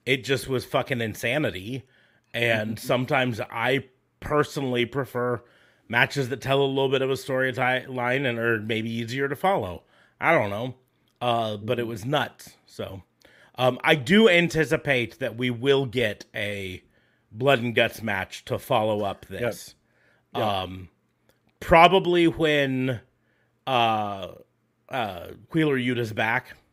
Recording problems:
none

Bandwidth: 15.5 kHz